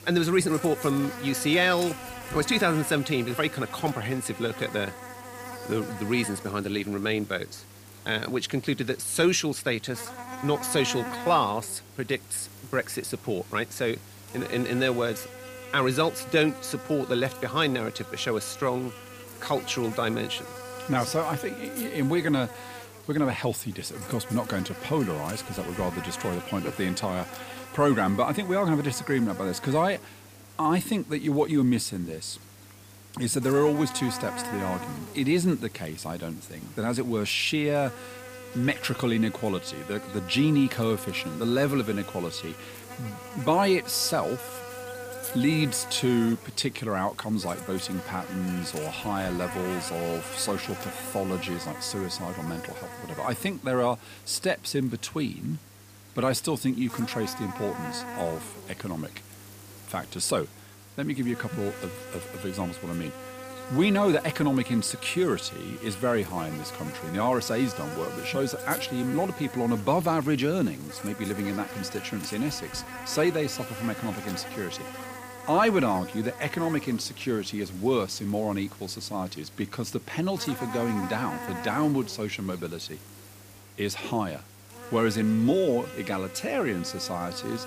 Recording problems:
electrical hum; noticeable; throughout; 50 Hz, 10 dB below the speech

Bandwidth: 15 kHz